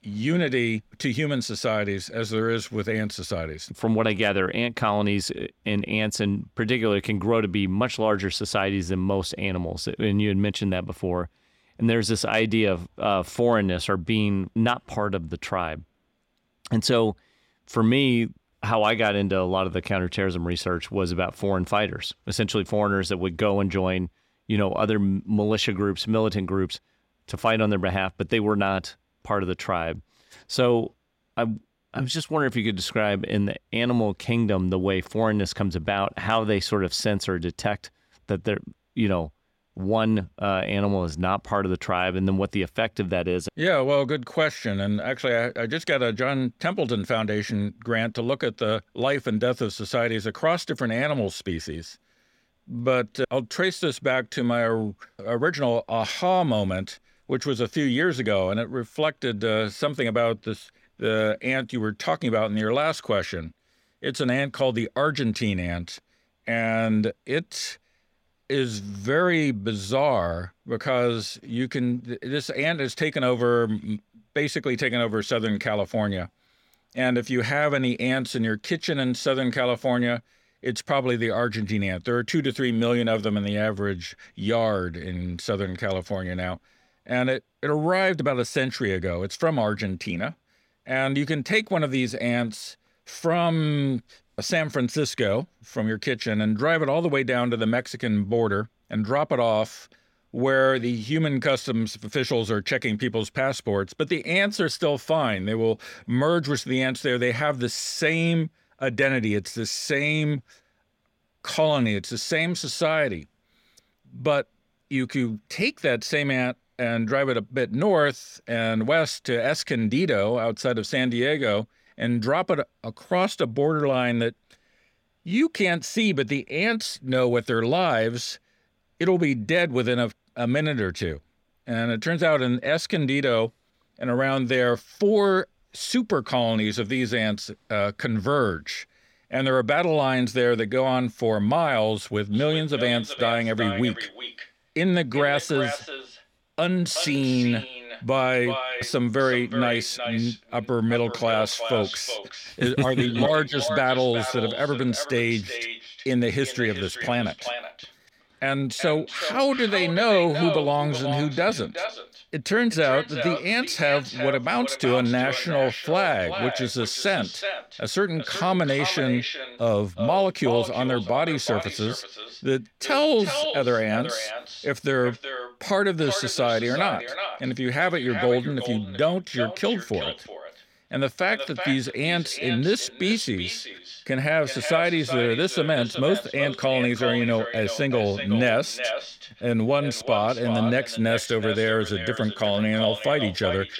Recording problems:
echo of what is said; strong; from 2:22 on; 370 ms later, 7 dB below the speech

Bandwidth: 16.5 kHz